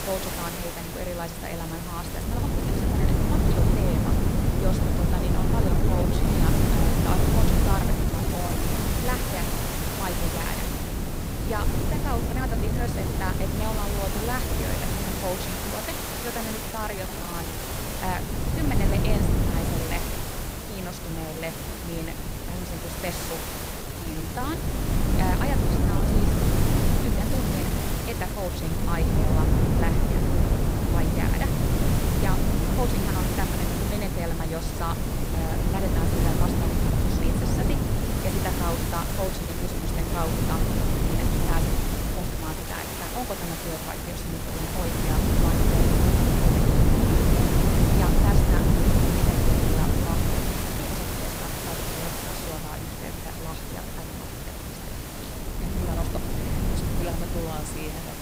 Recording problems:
wind noise on the microphone; heavy; 2 dB above the speech
hiss; very loud; throughout; 1 dB above the speech
uneven, jittery; strongly; from 2 to 56 s

